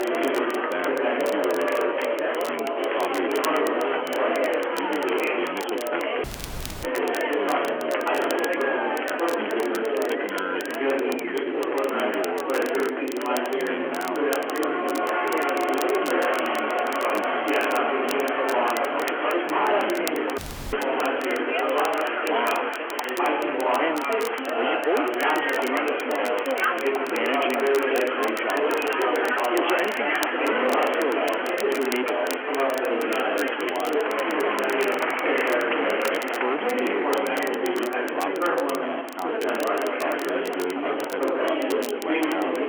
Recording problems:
phone-call audio; nothing above 3.5 kHz
distortion; slight; 14% of the sound clipped
chatter from many people; very loud; throughout; 7 dB above the speech
crackle, like an old record; loud; 10 dB below the speech
audio cutting out; at 6 s for 0.5 s and at 20 s

